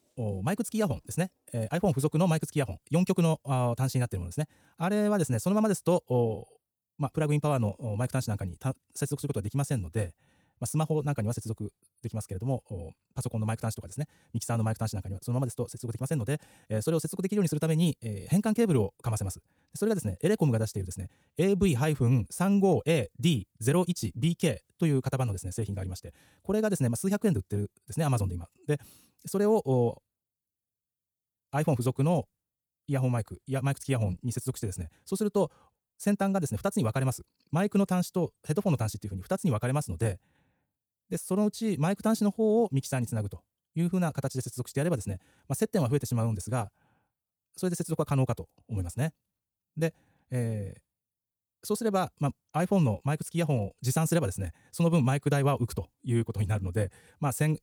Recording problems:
wrong speed, natural pitch; too fast; 1.6 times normal speed

